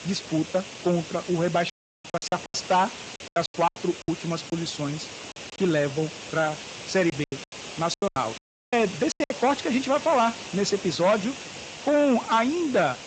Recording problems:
distortion; slight; 6% of the sound clipped
garbled, watery; slightly; nothing above 7.5 kHz
hiss; noticeable; throughout; 10 dB below the speech
audio cutting out; at 1.5 s and at 8.5 s
choppy; very; from 2 to 5.5 s and from 7 to 9.5 s; 18% of the speech affected

